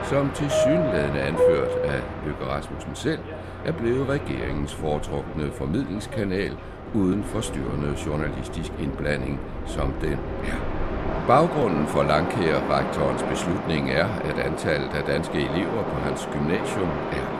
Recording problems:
train or aircraft noise; loud; throughout; 3 dB below the speech

